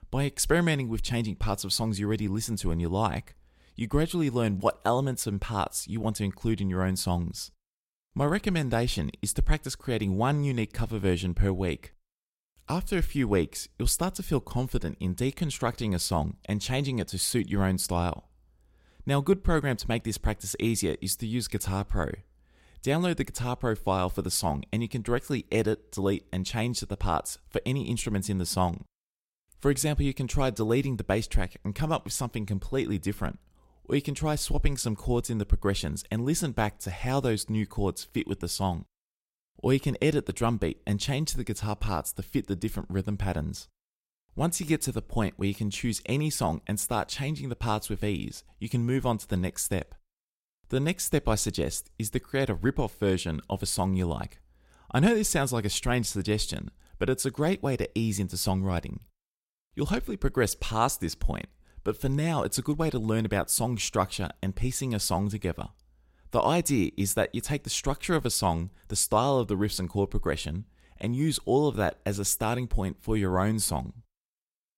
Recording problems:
none

